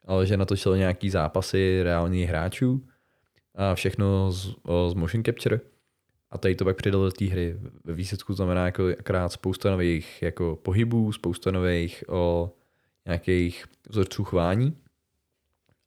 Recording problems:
none

